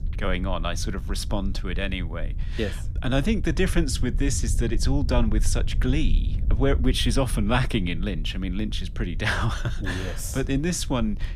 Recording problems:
low rumble; noticeable; throughout; 20 dB below the speech

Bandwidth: 15 kHz